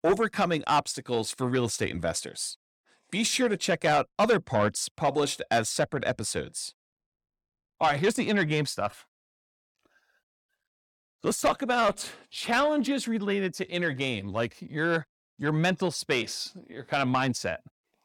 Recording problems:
distortion; slight; 10 dB below the speech

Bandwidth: 18 kHz